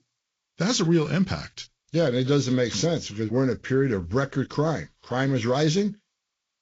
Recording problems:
garbled, watery; slightly; nothing above 7 kHz

